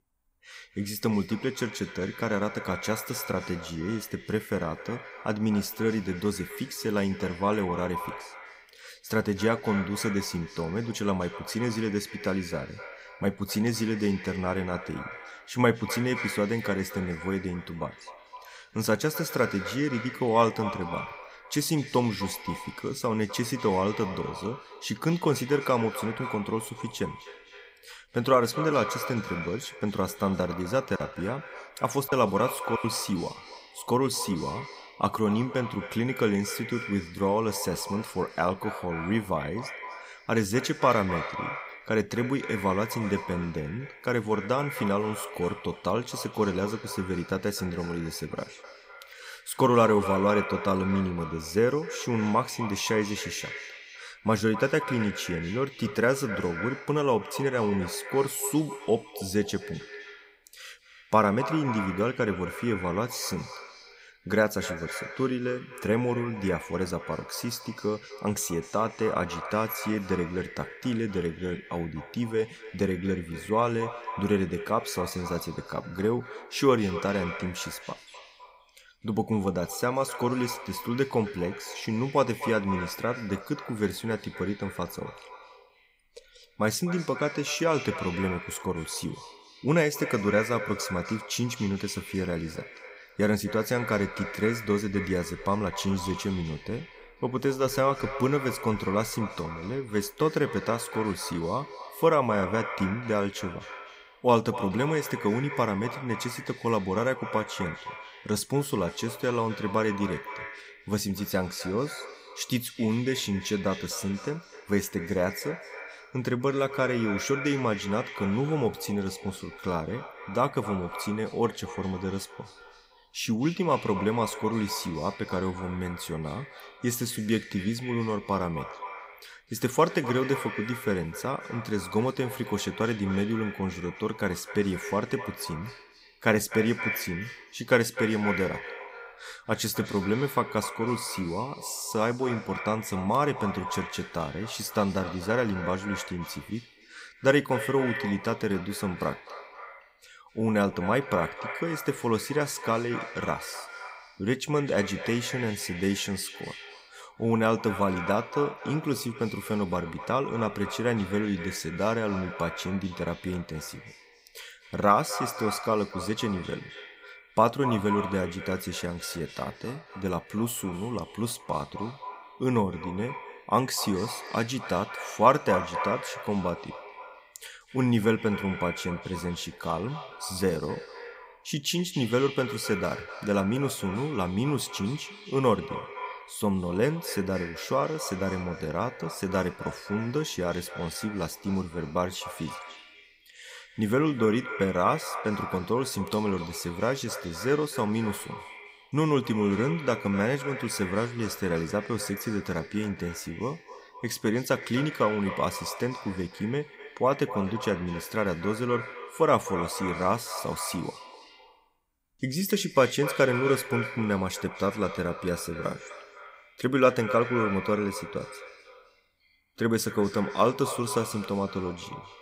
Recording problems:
echo of what is said; strong; throughout; 250 ms later, 10 dB below the speech
choppy; occasionally; from 31 to 33 s; 3% of the speech affected

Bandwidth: 15.5 kHz